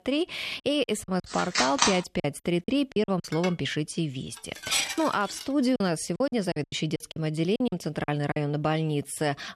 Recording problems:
choppy; very; at 1 s, from 2 to 3 s and from 6 to 8.5 s; 12% of the speech affected
phone ringing; loud; at 1.5 s; peak 5 dB above the speech
clattering dishes; loud; from 3.5 to 5.5 s; peak 1 dB above the speech

